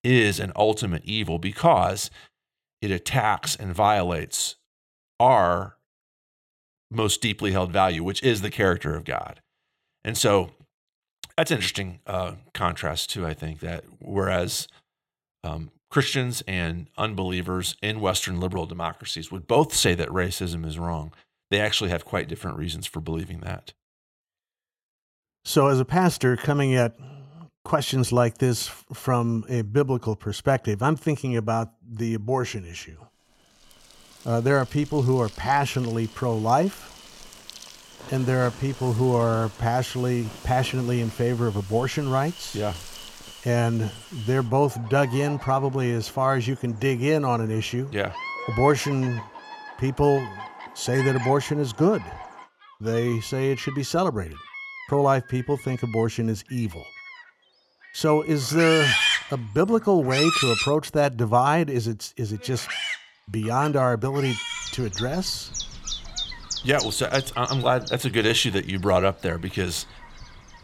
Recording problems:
animal sounds; loud; from 34 s on; 7 dB below the speech

